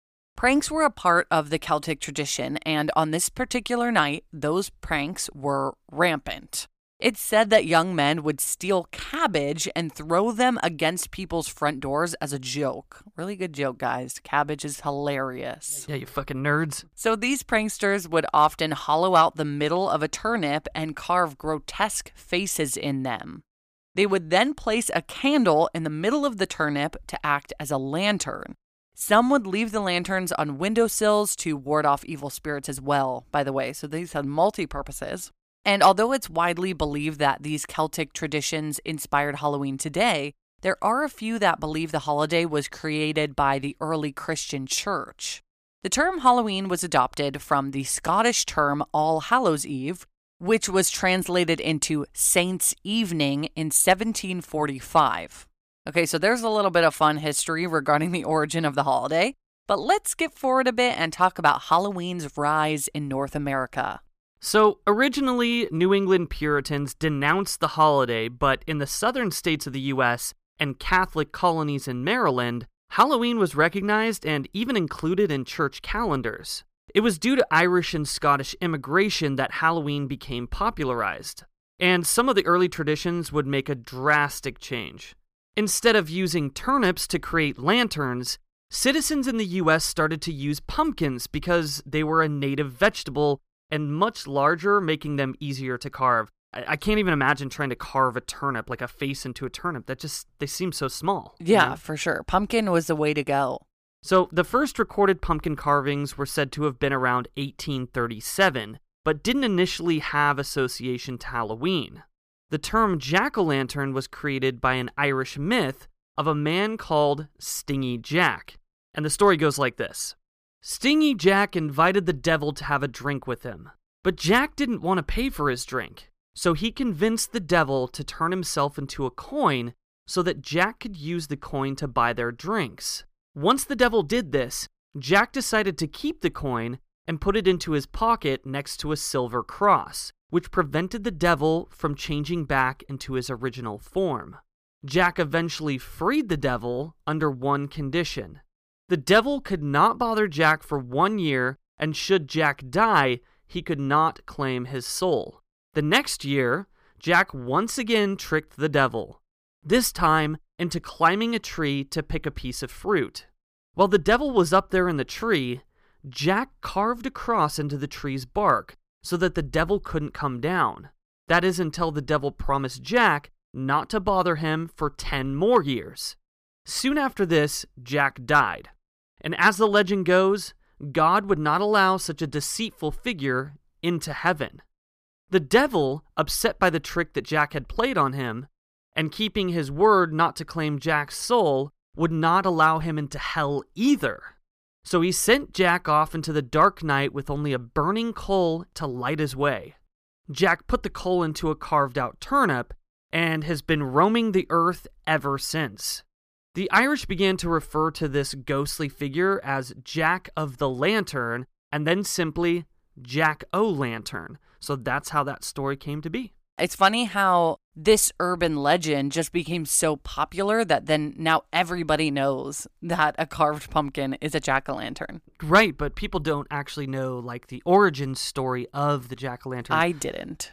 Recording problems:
none

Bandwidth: 15 kHz